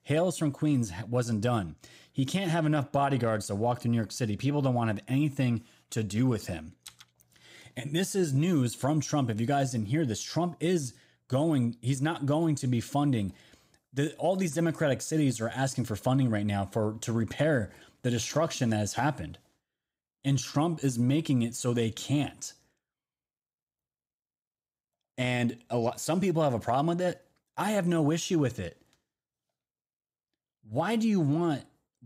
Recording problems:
none

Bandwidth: 15.5 kHz